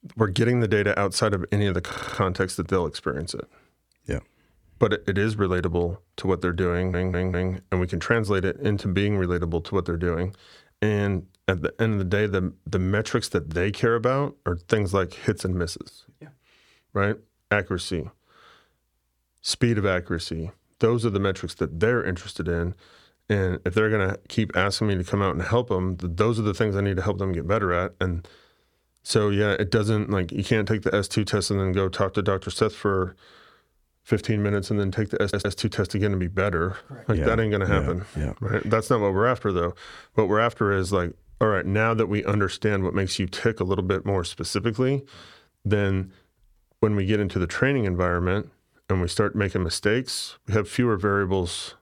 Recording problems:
audio stuttering; at 2 s, at 6.5 s and at 35 s

